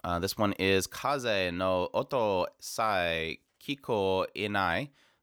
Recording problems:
none

